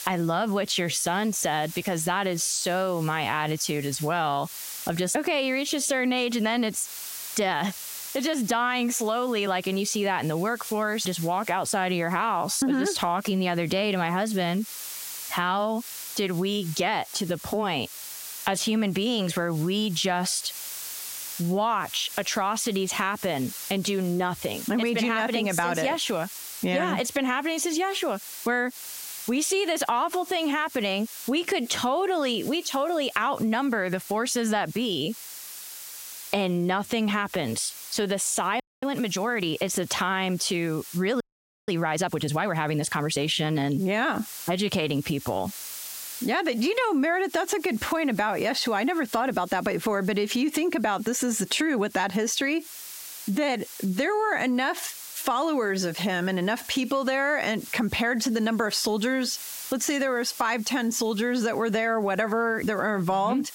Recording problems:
squashed, flat; heavily
hiss; noticeable; throughout; 15 dB below the speech
audio freezing; at 39 s and at 41 s

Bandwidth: 16 kHz